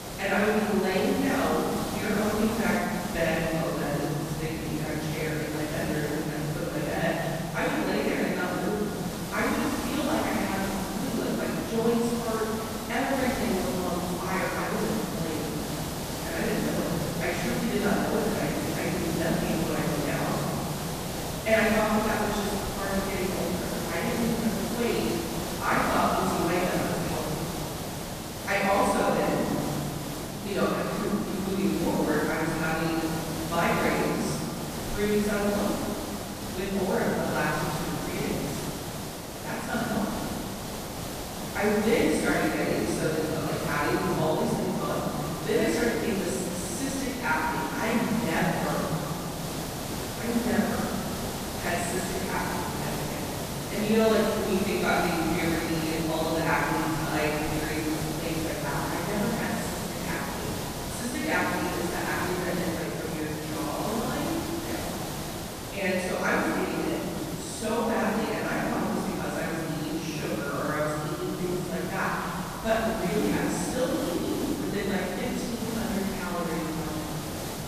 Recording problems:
room echo; strong; dies away in 2.9 s
off-mic speech; far
hiss; loud; throughout; 6 dB below the speech

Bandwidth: 14.5 kHz